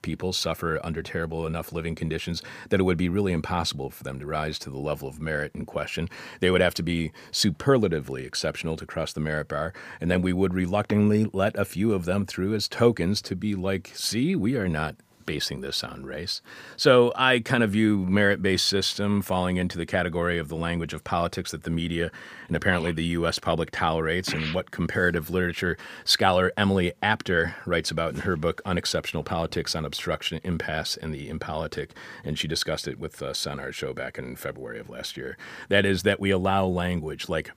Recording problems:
none

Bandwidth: 15 kHz